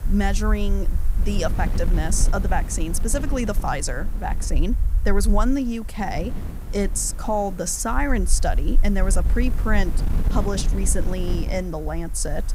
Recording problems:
wind noise on the microphone; occasional gusts; from 1 to 4.5 s, from 6 to 8 s and from 9 to 12 s; 15 dB below the speech
hiss; faint; throughout; 20 dB below the speech
low rumble; faint; throughout; 25 dB below the speech

